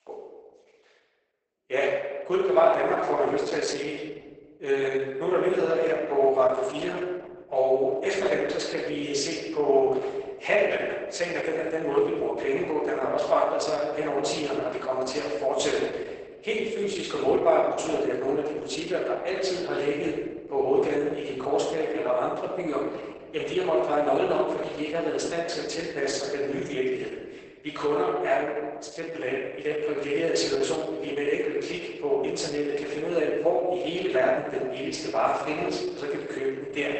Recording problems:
off-mic speech; far
garbled, watery; badly; nothing above 8 kHz
thin; very; fading below 350 Hz
room echo; noticeable; dies away in 1.2 s

